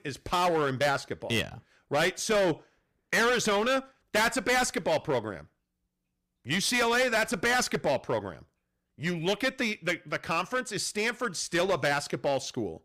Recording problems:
distortion; heavy; 10% of the sound clipped

